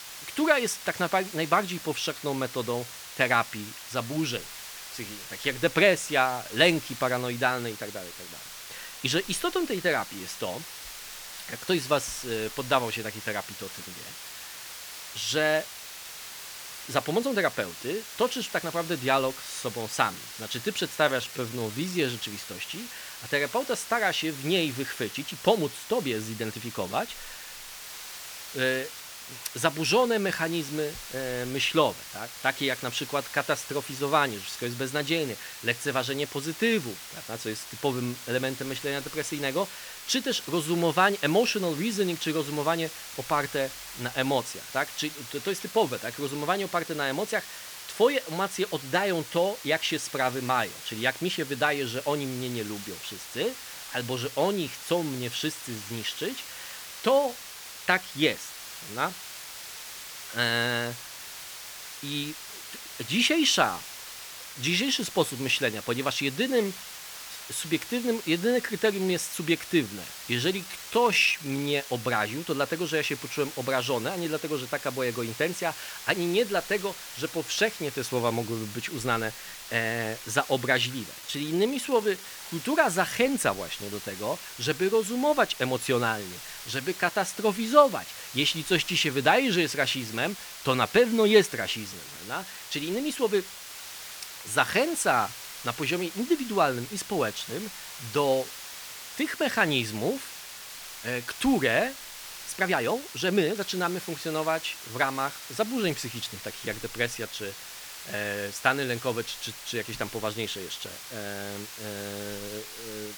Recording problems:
hiss; noticeable; throughout; 10 dB below the speech
uneven, jittery; strongly; from 21 s to 1:44

